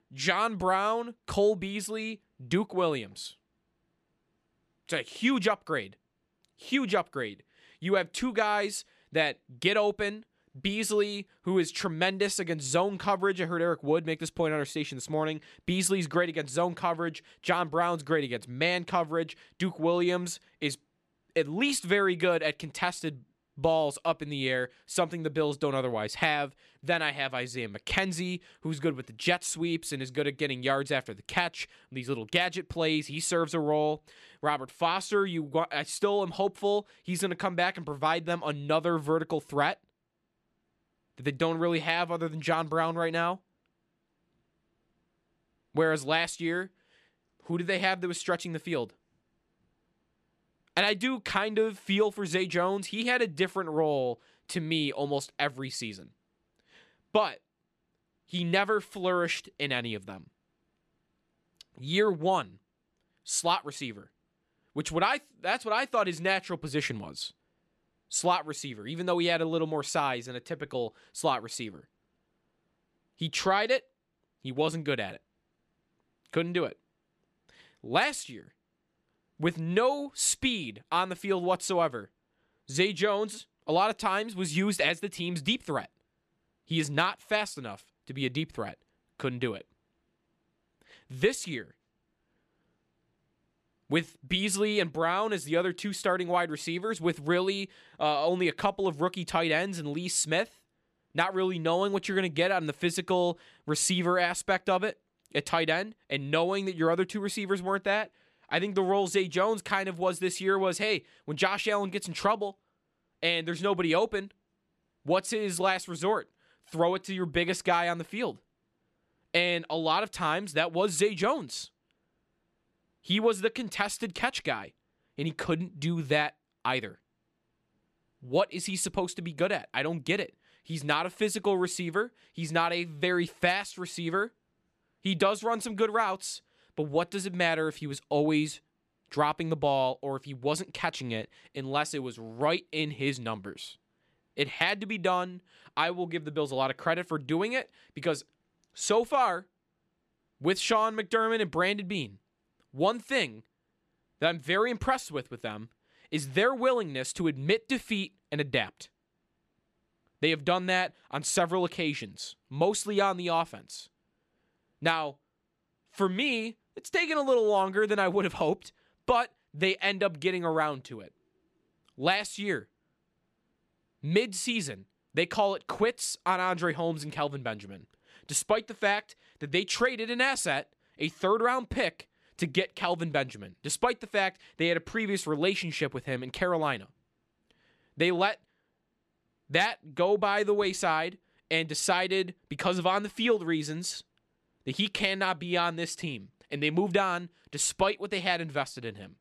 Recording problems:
none

